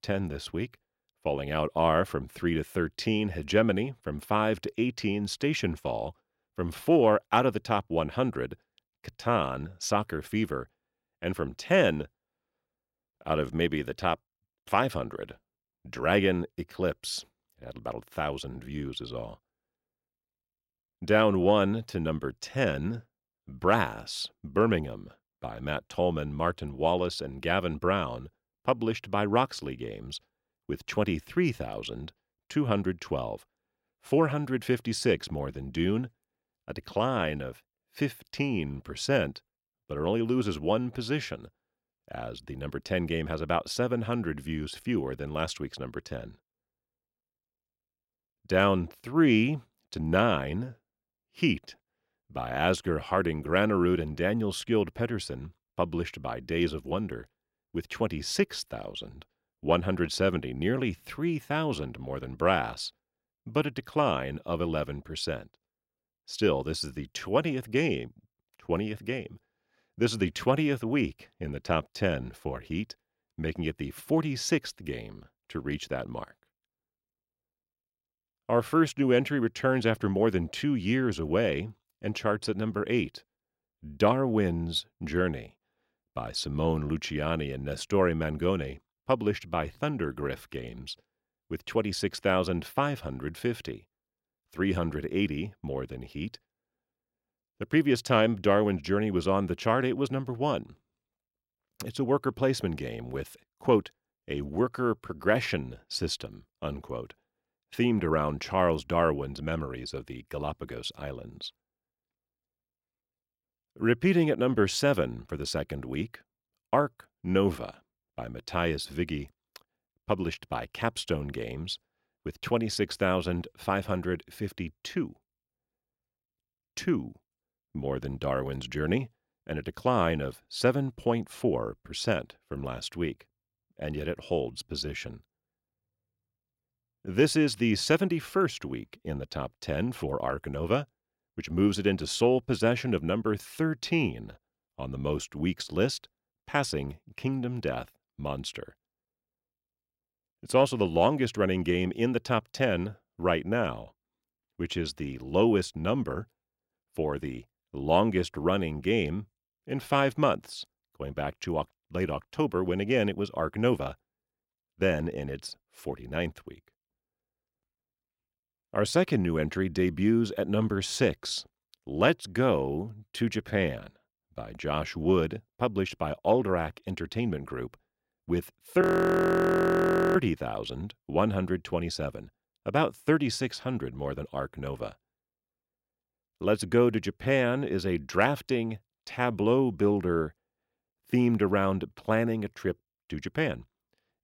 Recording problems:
audio freezing; at 2:59 for 1.5 s

